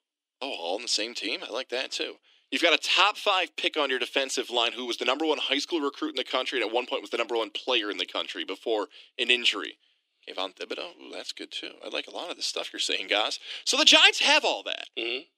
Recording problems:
thin; somewhat; fading below 300 Hz

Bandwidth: 15.5 kHz